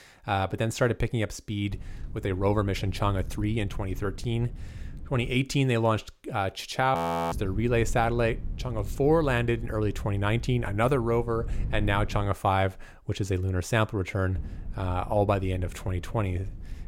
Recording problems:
wind noise on the microphone; occasional gusts; from 1.5 to 5.5 s, from 7.5 to 12 s and from 14 s on; 25 dB below the speech
audio freezing; at 7 s

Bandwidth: 16 kHz